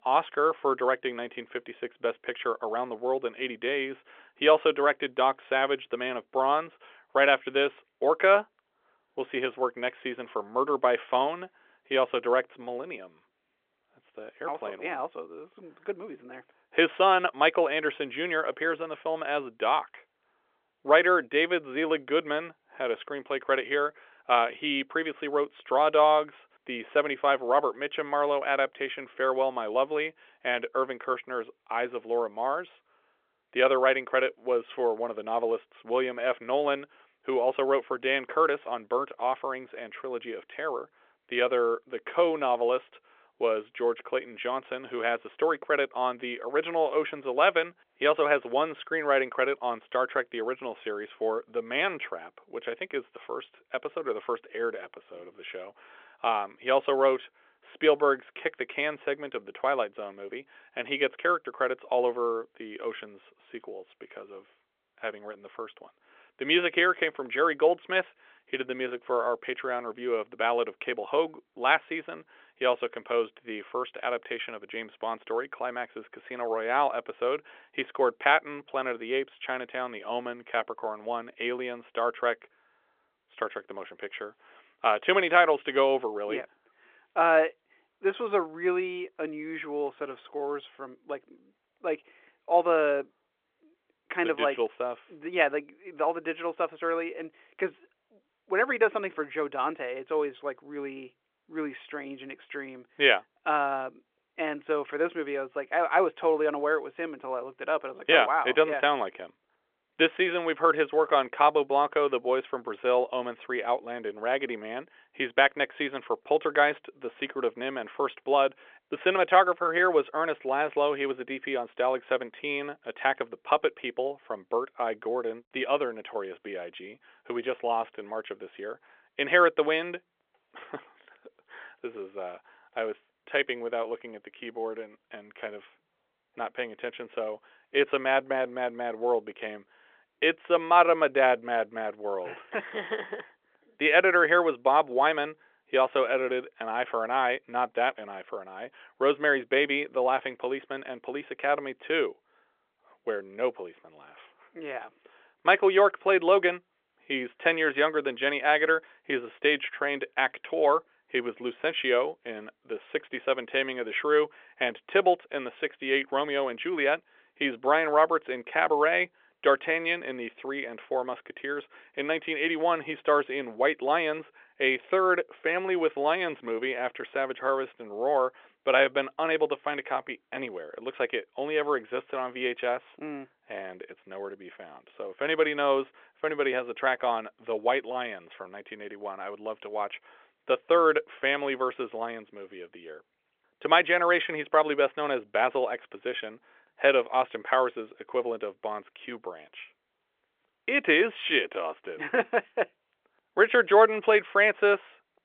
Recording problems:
phone-call audio; nothing above 3.5 kHz

